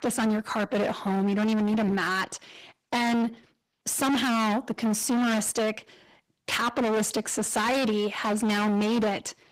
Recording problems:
distortion; heavy; 30% of the sound clipped
garbled, watery; slightly; nothing above 15.5 kHz

